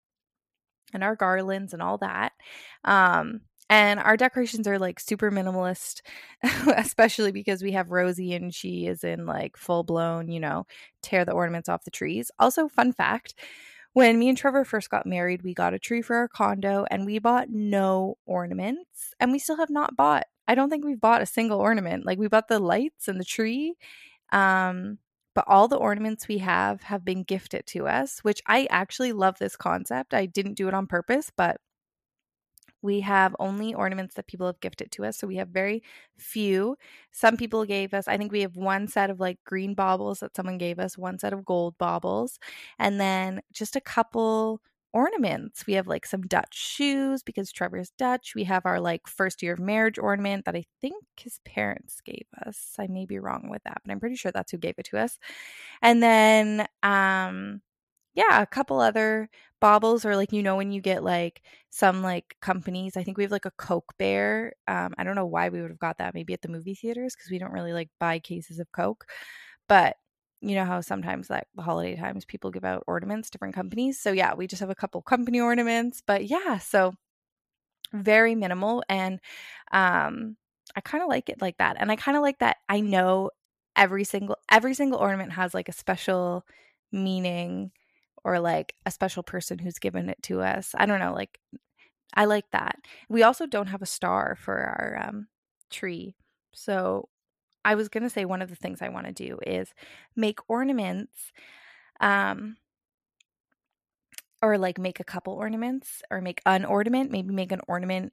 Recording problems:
none

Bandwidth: 14.5 kHz